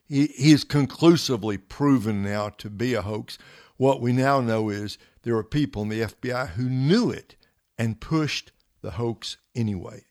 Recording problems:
none

